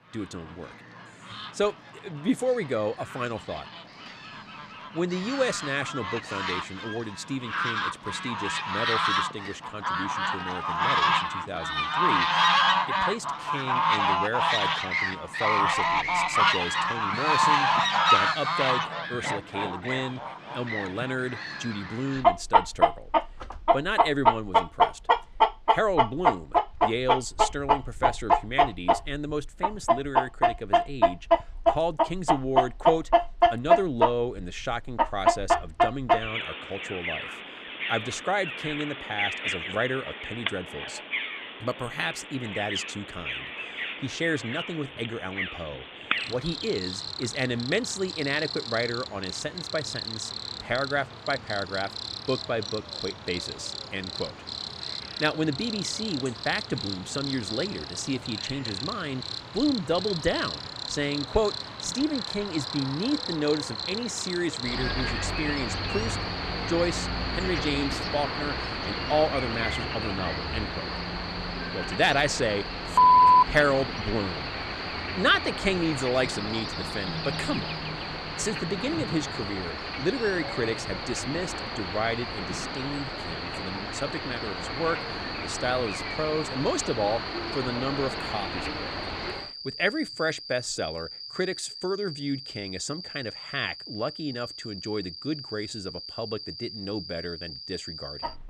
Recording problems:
animal sounds; very loud; throughout; 1 dB above the speech

